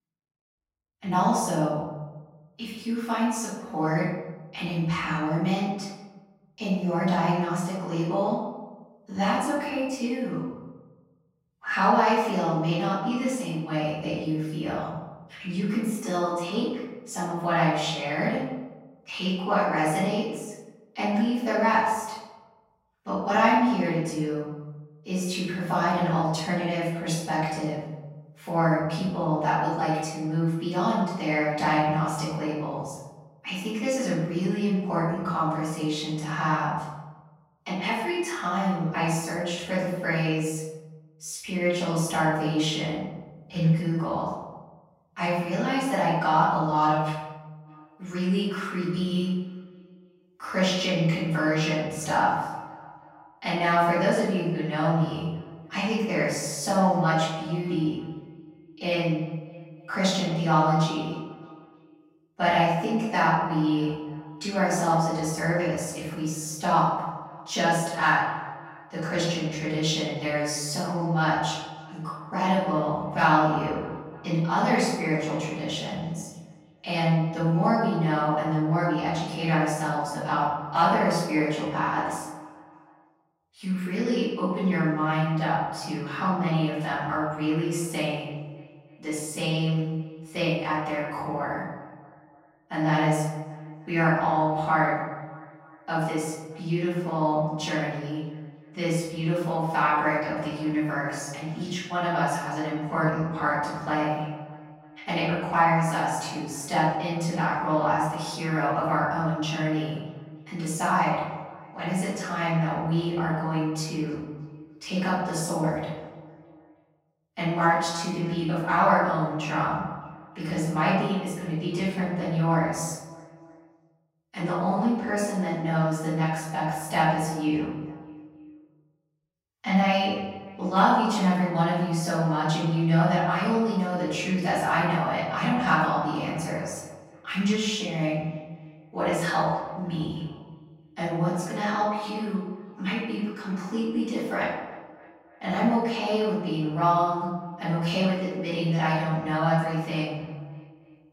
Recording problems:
off-mic speech; far
room echo; noticeable; dies away in 1.1 s
echo of what is said; faint; from 48 s on; 310 ms later, 20 dB below the speech

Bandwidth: 16 kHz